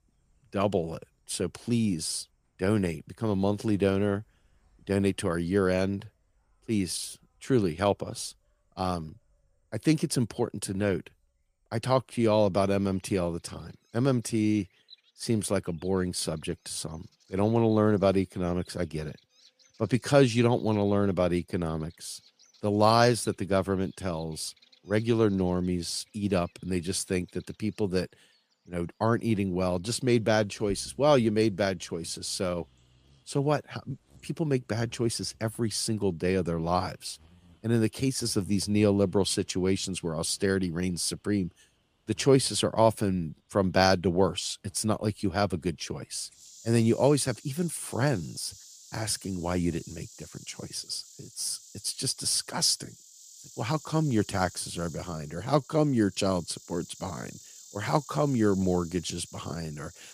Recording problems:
animal sounds; faint; throughout; 25 dB below the speech

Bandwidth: 15 kHz